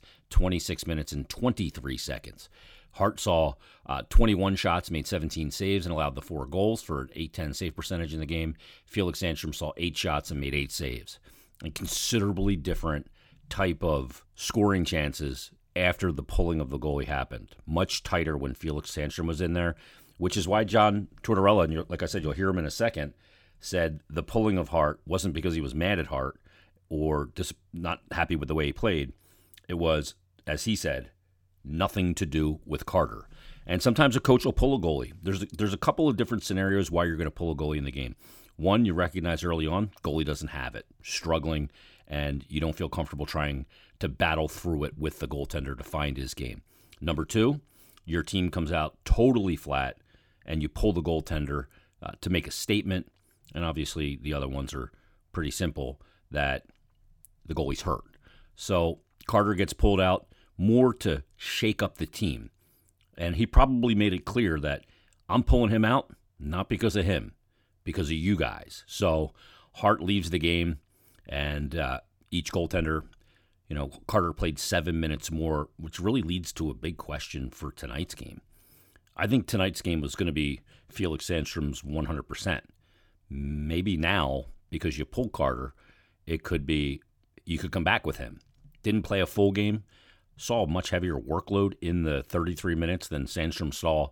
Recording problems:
none

